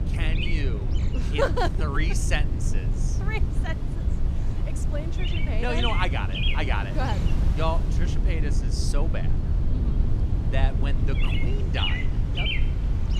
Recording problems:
animal sounds; loud; throughout; 4 dB below the speech
low rumble; loud; throughout; 9 dB below the speech
wind noise on the microphone; occasional gusts; 15 dB below the speech

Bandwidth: 15 kHz